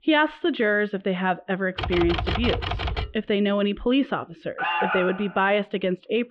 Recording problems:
muffled; very; fading above 3 kHz
keyboard typing; noticeable; from 2 to 3 s; peak 2 dB below the speech
alarm; loud; at 4.5 s; peak 1 dB above the speech

